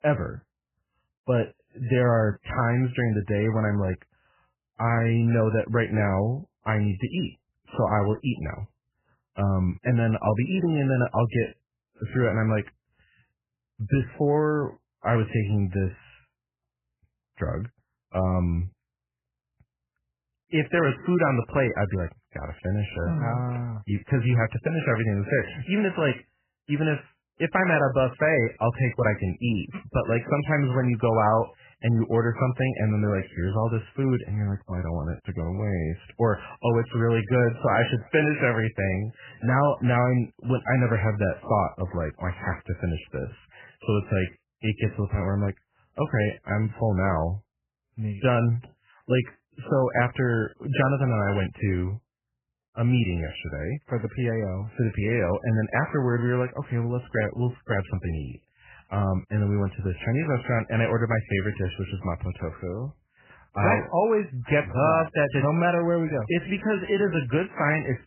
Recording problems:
garbled, watery; badly; nothing above 3 kHz

